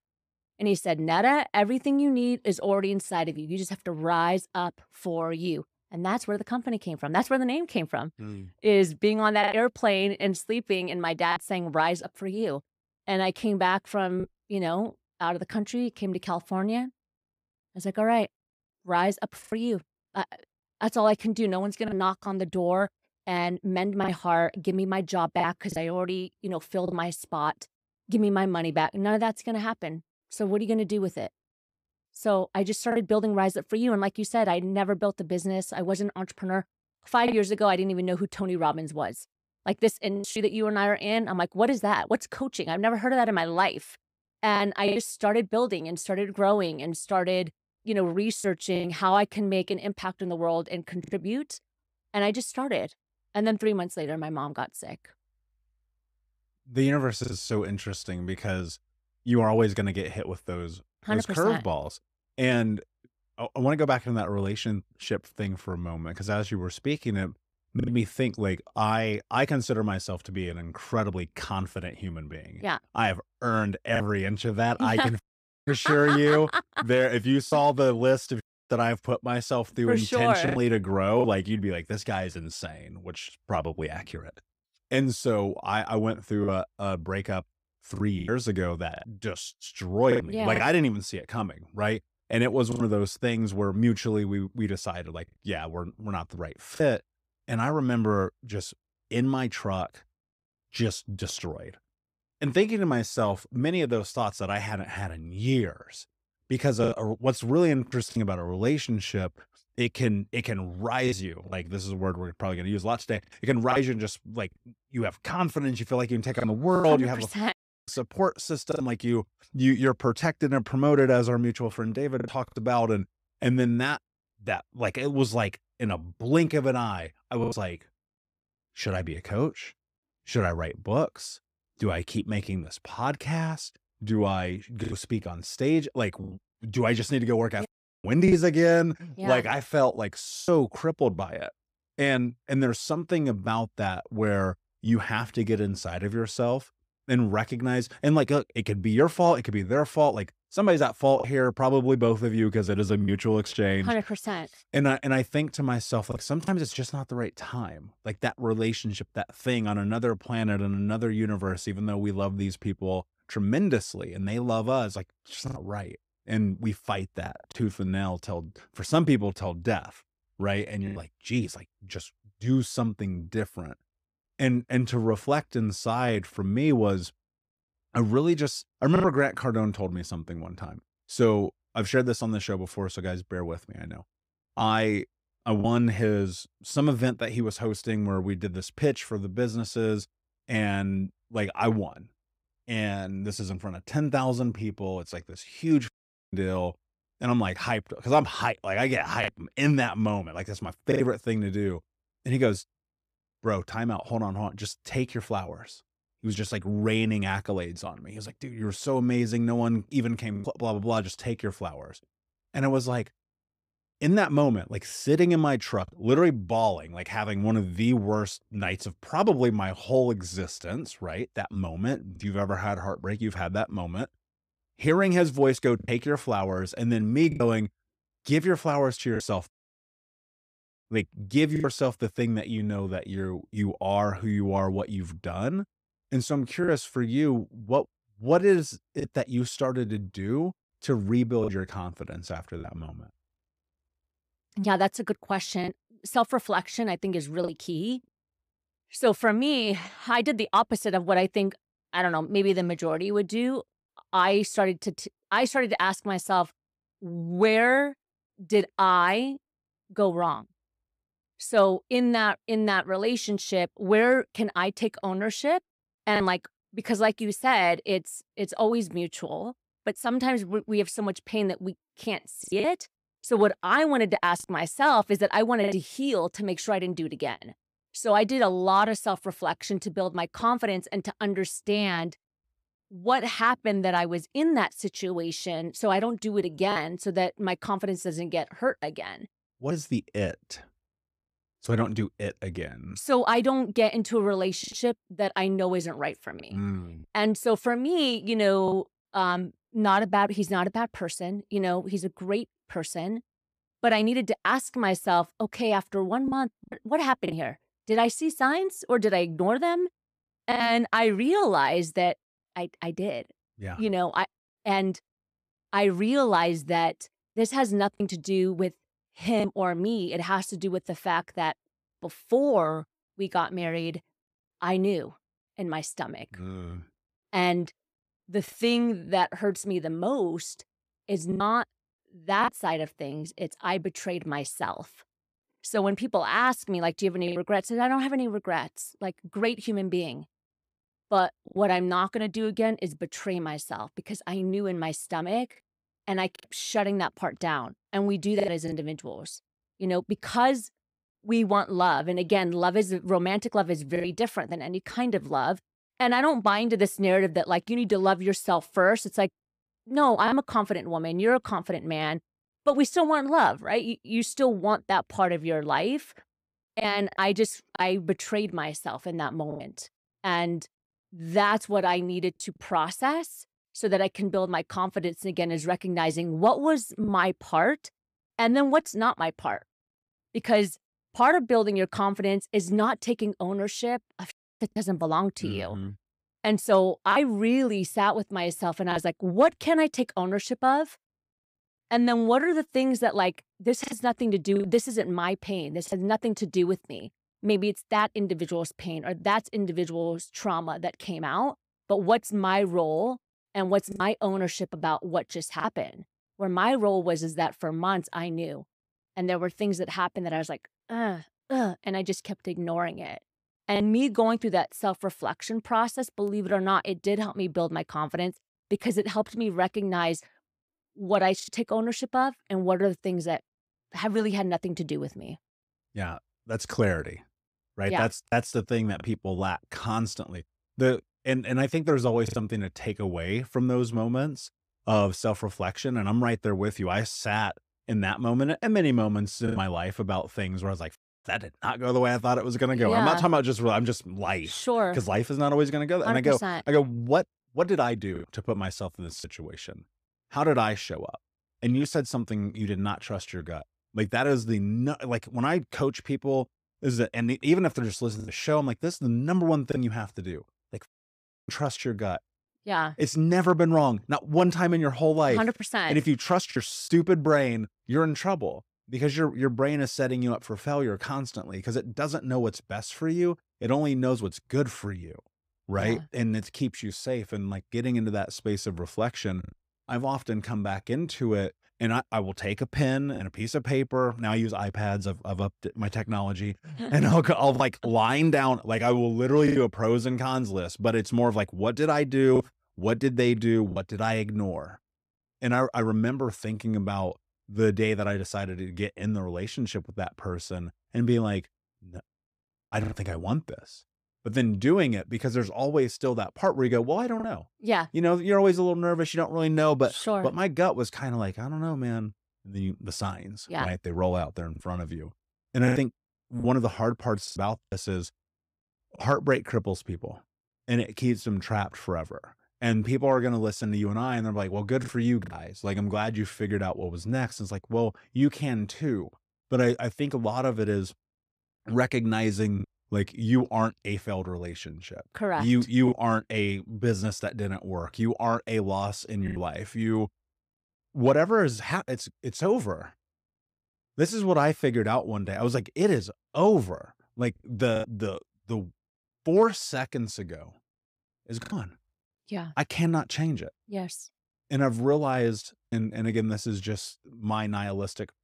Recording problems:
choppy; occasionally; 2% of the speech affected

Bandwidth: 15 kHz